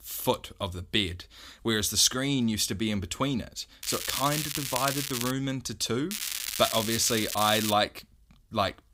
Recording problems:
crackling; loud; from 4 to 5.5 s and from 6 to 7.5 s; 4 dB below the speech

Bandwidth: 15.5 kHz